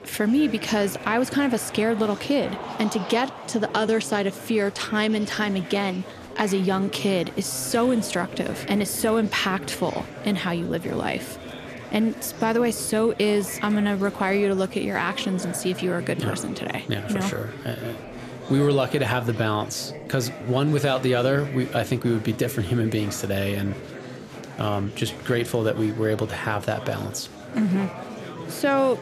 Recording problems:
murmuring crowd; noticeable; throughout; 10 dB below the speech

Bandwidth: 14.5 kHz